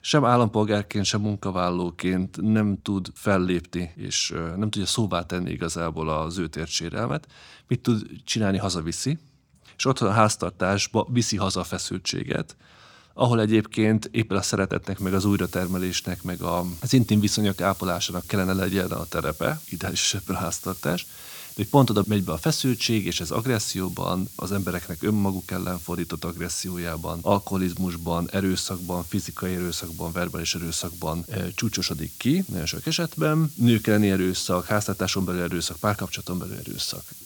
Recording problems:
hiss; noticeable; from 15 s on; 15 dB below the speech

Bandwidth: 18.5 kHz